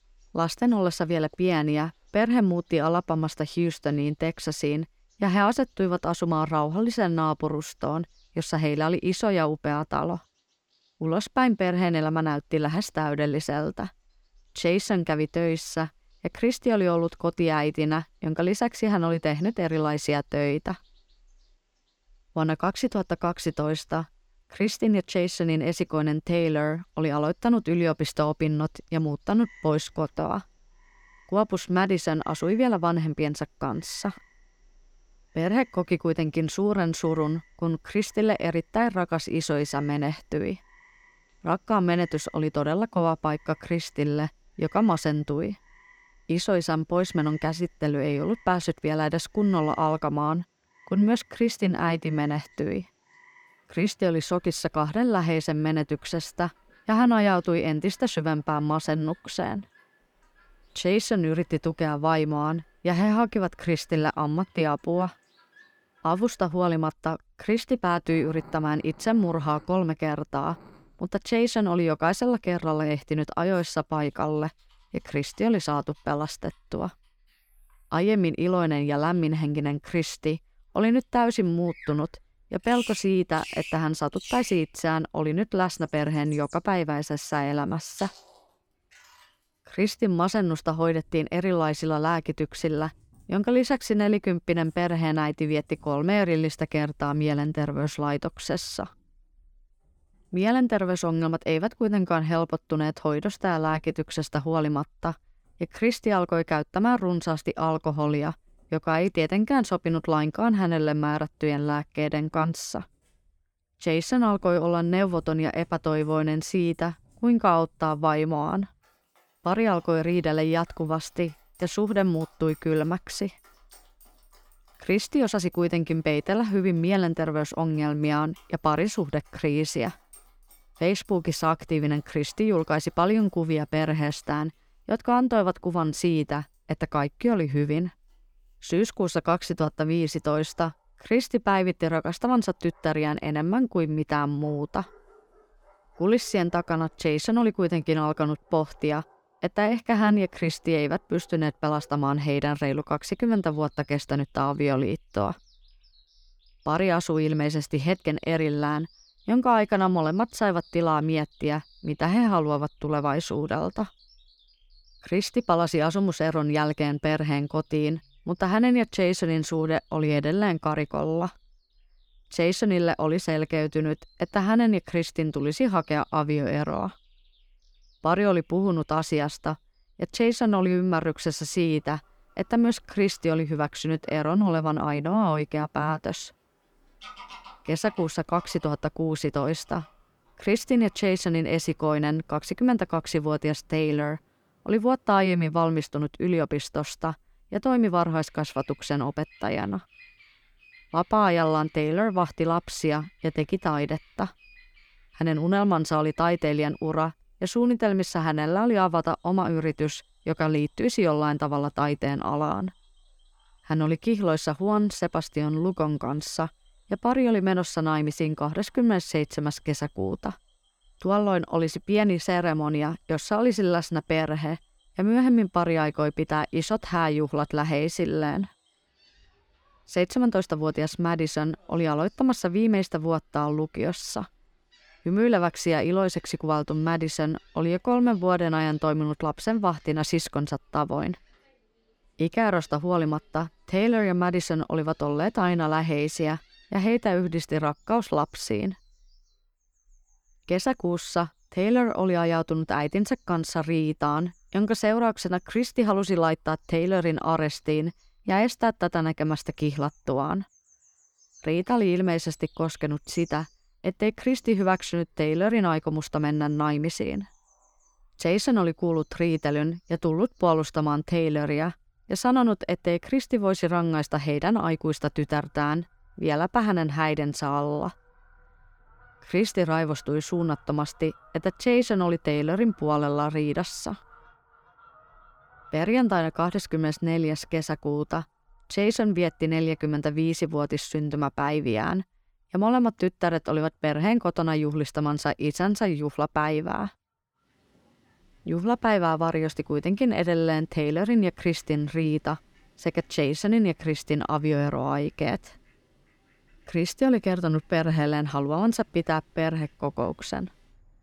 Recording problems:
animal sounds; faint; throughout; 30 dB below the speech

